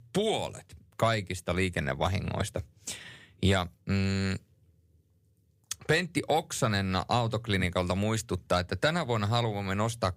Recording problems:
none

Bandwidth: 15.5 kHz